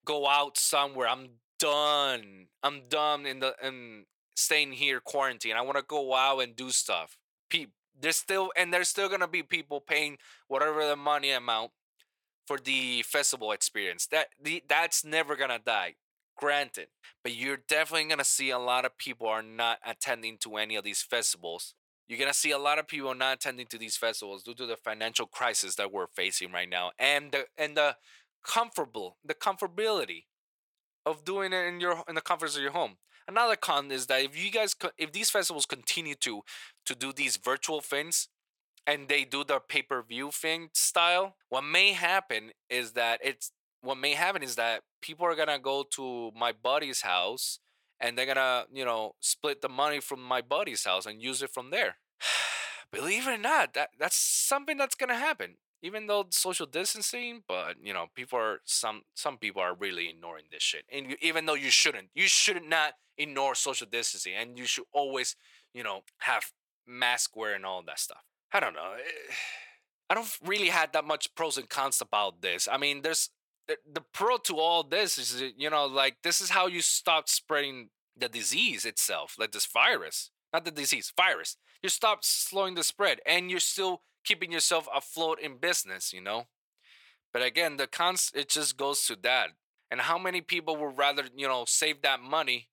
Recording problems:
thin; very; fading below 700 Hz

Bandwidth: 18 kHz